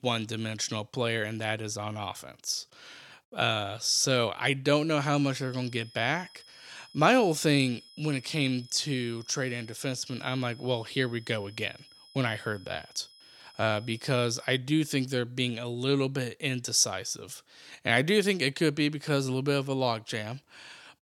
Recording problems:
high-pitched whine; faint; from 5.5 to 15 s; 5 kHz, 25 dB below the speech

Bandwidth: 17.5 kHz